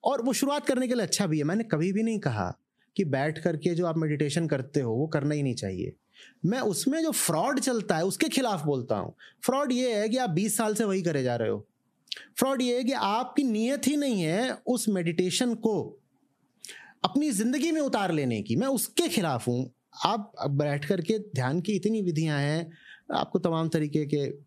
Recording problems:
squashed, flat; heavily

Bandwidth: 14.5 kHz